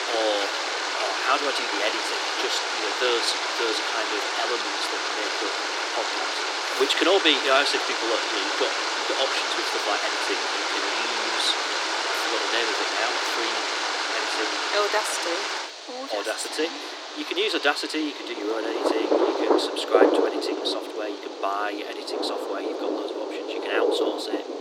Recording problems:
thin; very; fading below 300 Hz
rain or running water; very loud; throughout; 2 dB above the speech
household noises; faint; throughout; 25 dB below the speech

